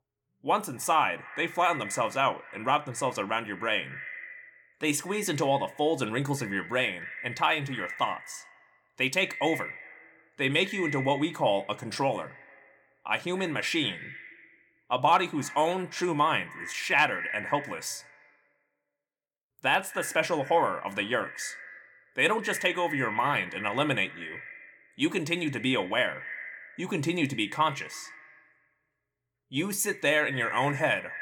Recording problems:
echo of what is said; strong; throughout; 110 ms later, 10 dB below the speech

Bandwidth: 18 kHz